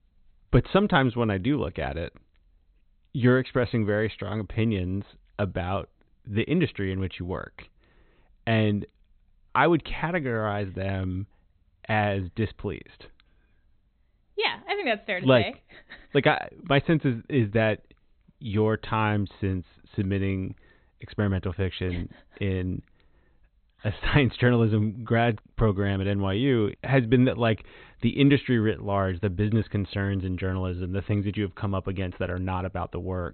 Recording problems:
high frequencies cut off; severe; nothing above 4 kHz

